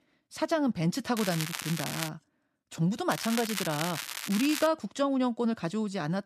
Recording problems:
crackling; loud; at 1 s and from 3 to 4.5 s; 5 dB below the speech

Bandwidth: 14.5 kHz